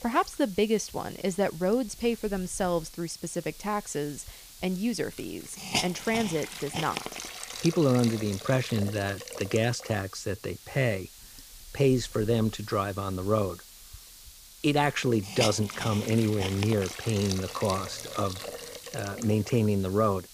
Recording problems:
hiss; noticeable; throughout; 10 dB below the speech

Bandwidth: 15 kHz